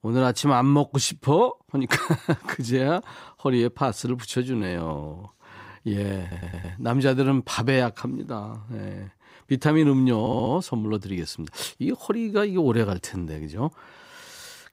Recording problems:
audio stuttering; at 6 s and at 10 s

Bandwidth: 15.5 kHz